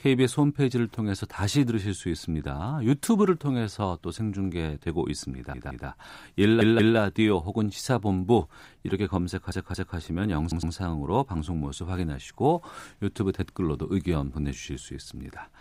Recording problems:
audio stuttering; 4 times, first at 5.5 s

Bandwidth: 15.5 kHz